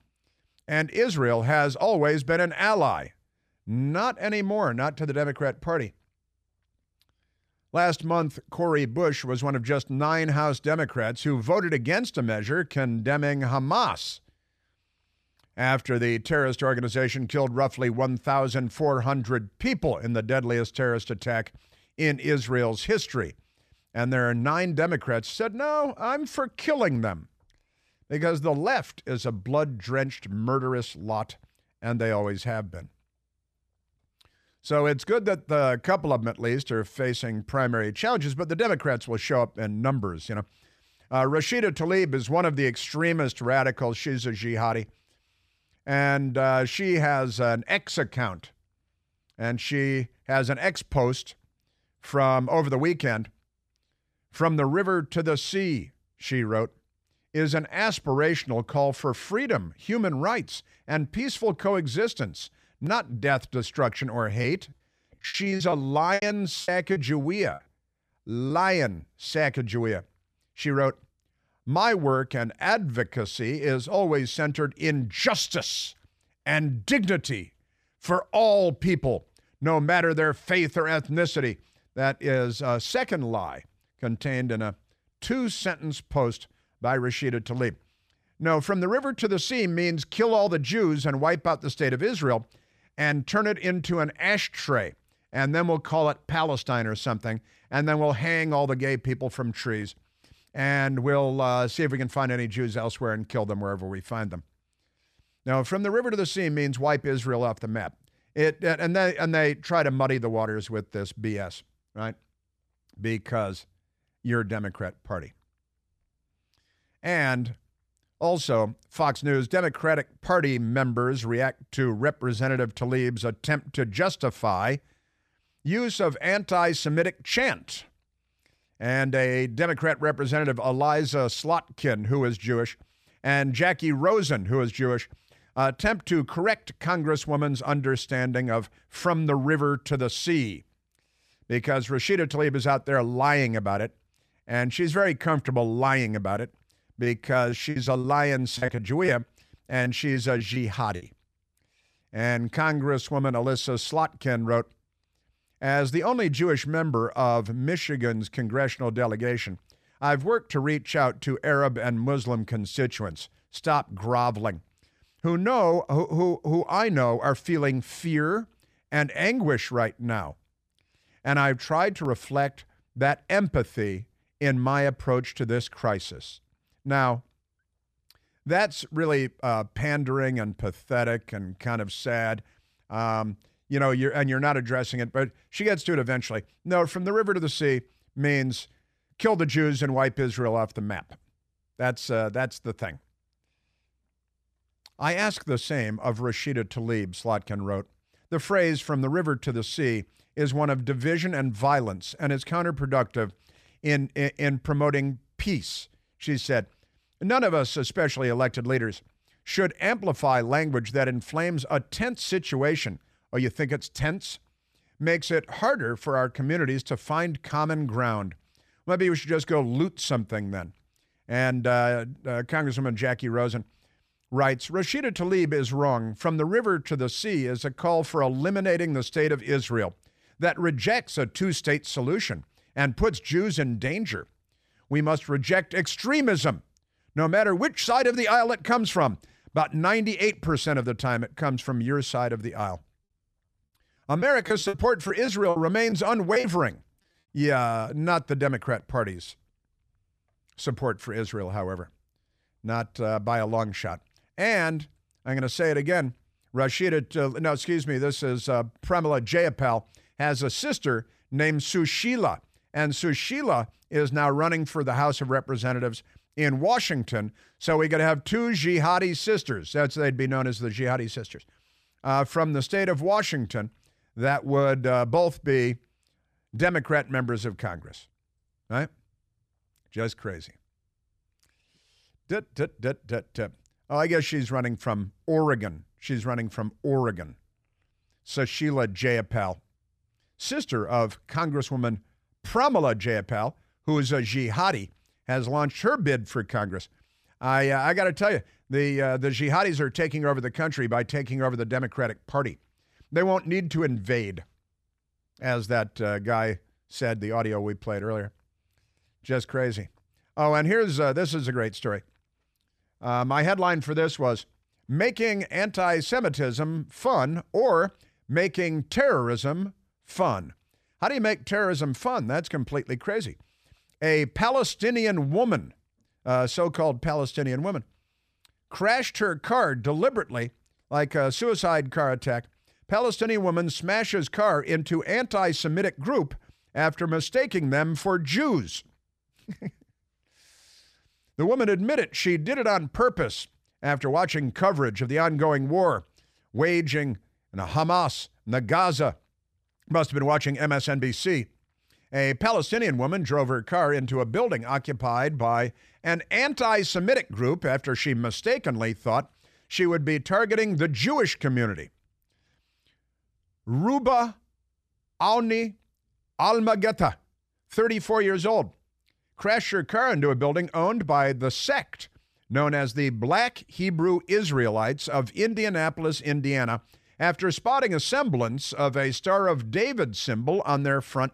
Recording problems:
choppy; very; from 1:04 to 1:09, from 2:27 to 2:31 and from 4:04 to 4:06; 13% of the speech affected

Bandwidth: 14.5 kHz